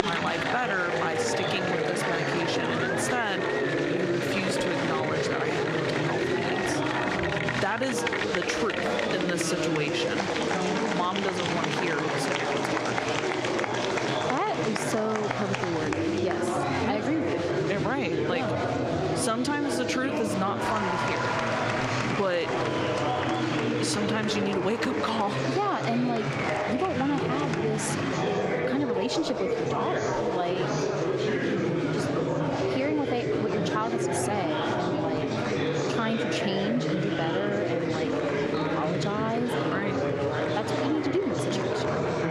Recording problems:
squashed, flat; somewhat
chatter from many people; very loud; throughout; 3 dB above the speech

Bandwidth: 14.5 kHz